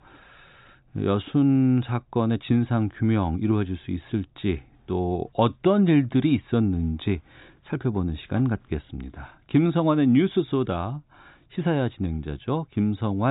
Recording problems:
high frequencies cut off; severe; nothing above 4 kHz
abrupt cut into speech; at the end

